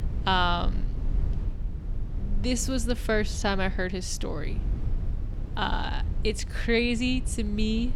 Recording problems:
low rumble; noticeable; throughout; 20 dB below the speech

